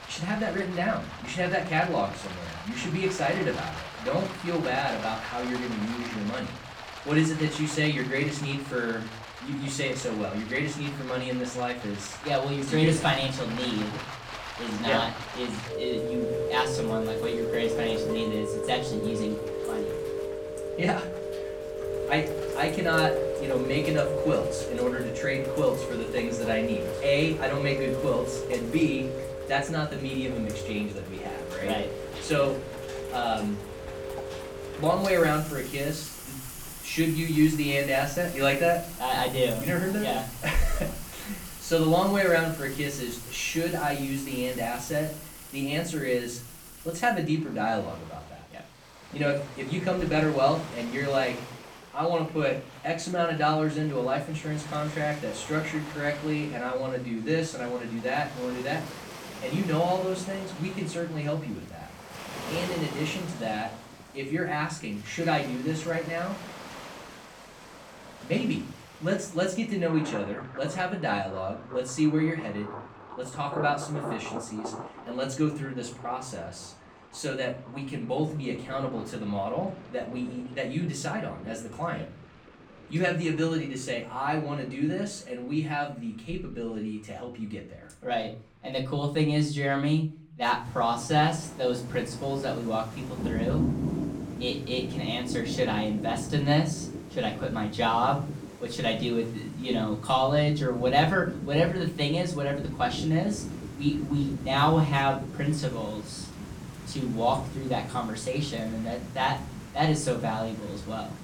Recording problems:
off-mic speech; far
room echo; slight; dies away in 0.4 s
rain or running water; loud; throughout; 8 dB below the speech

